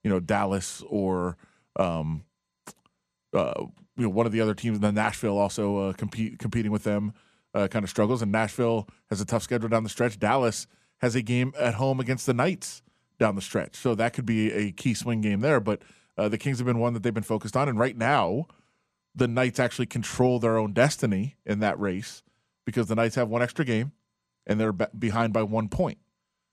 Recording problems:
none

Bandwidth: 14 kHz